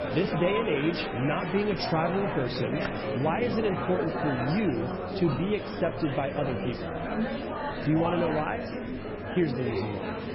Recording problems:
garbled, watery; badly; nothing above 5.5 kHz
murmuring crowd; loud; throughout; 3 dB below the speech
train or aircraft noise; noticeable; throughout; 20 dB below the speech
crowd noise; faint; throughout; 20 dB below the speech
hiss; faint; throughout; 25 dB below the speech
keyboard typing; faint; at 3 s; peak 15 dB below the speech

